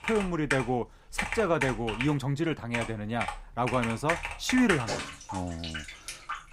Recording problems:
household noises; loud; throughout; 5 dB below the speech

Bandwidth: 15.5 kHz